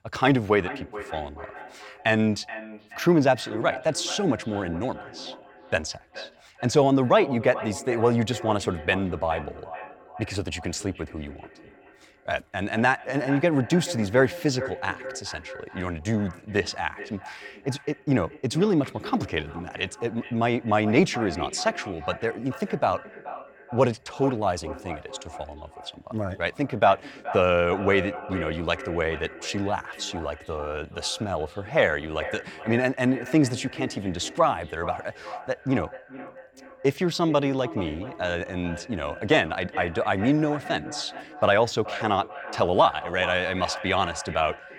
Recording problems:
echo of what is said; noticeable; throughout; 430 ms later, 15 dB below the speech

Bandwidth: 17.5 kHz